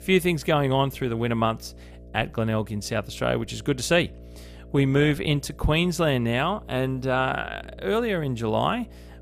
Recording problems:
electrical hum; faint; throughout; 60 Hz, 25 dB below the speech

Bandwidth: 14.5 kHz